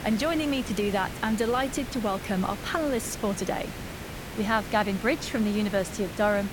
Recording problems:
hiss; loud; throughout; 10 dB below the speech

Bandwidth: 17.5 kHz